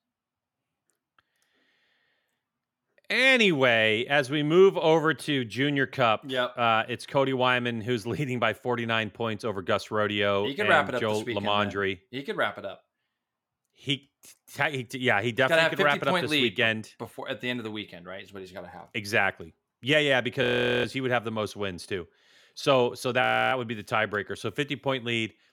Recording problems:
audio freezing; at 20 s and at 23 s

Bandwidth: 17 kHz